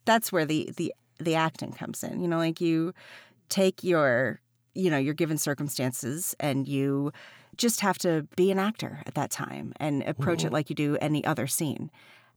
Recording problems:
none

